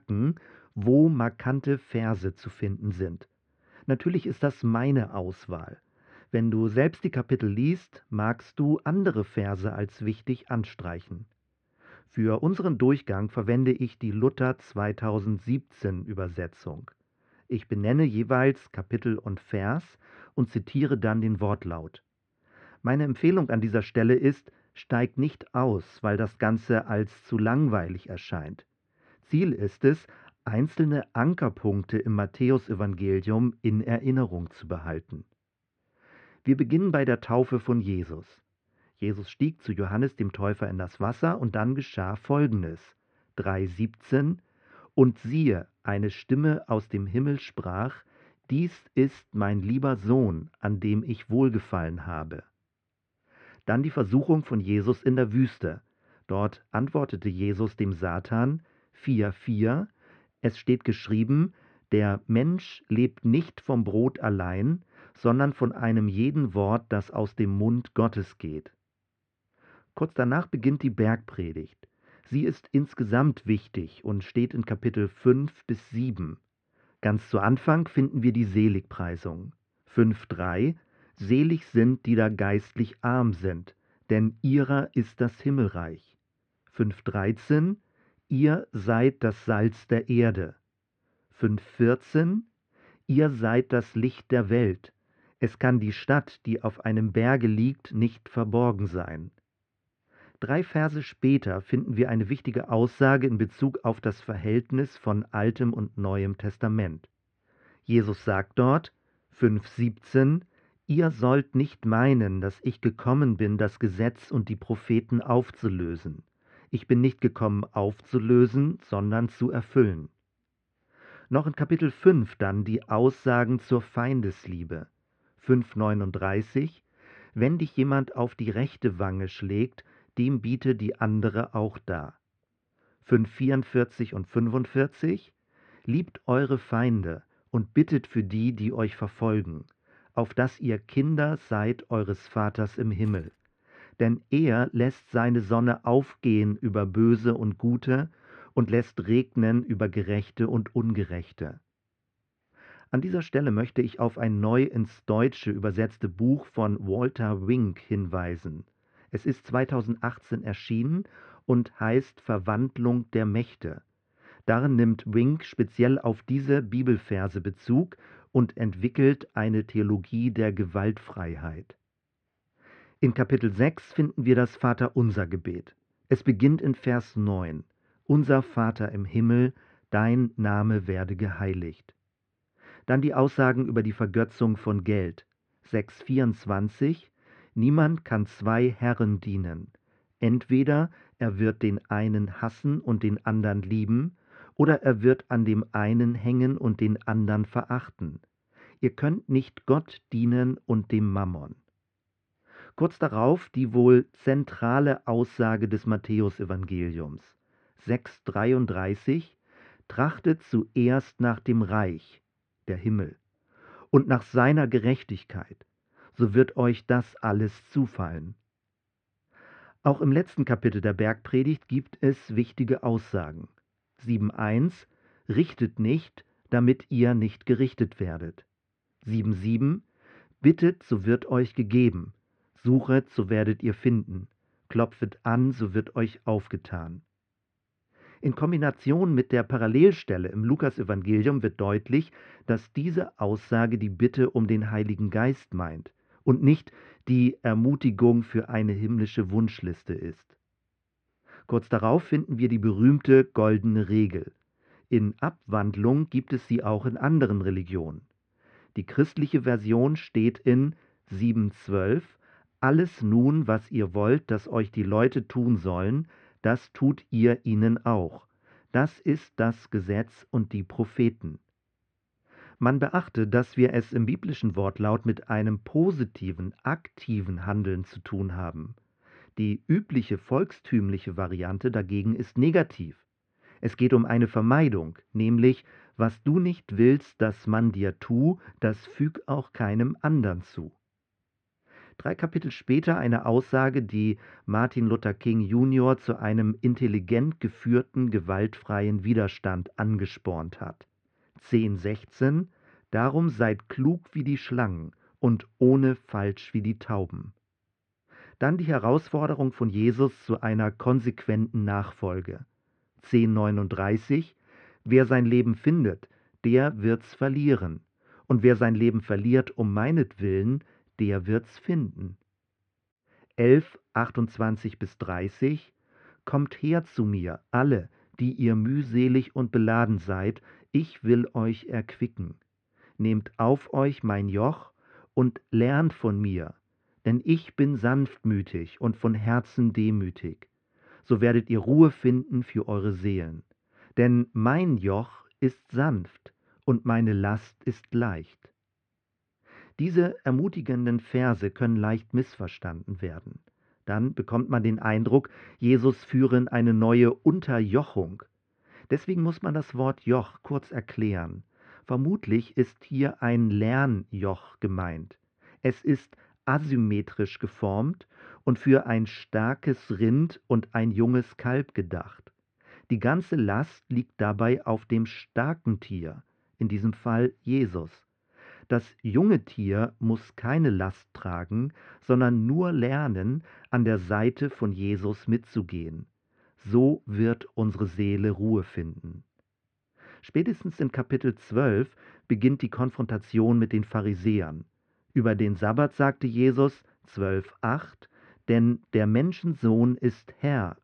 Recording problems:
muffled; very; fading above 2 kHz
jangling keys; very faint; at 2:23; peak 30 dB below the speech

